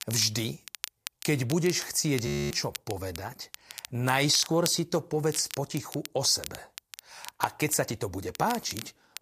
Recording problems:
crackle, like an old record; noticeable; 15 dB below the speech
audio freezing; at 2.5 s

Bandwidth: 14.5 kHz